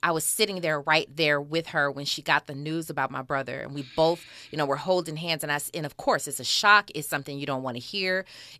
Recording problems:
none

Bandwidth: 14 kHz